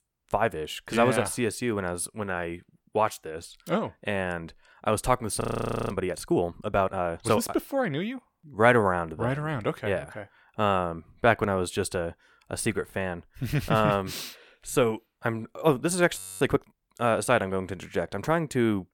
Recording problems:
audio freezing; at 5.5 s and at 16 s

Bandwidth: 17.5 kHz